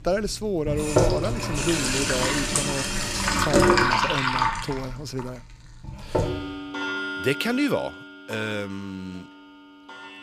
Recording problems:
household noises; very loud; throughout; 5 dB above the speech

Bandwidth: 15 kHz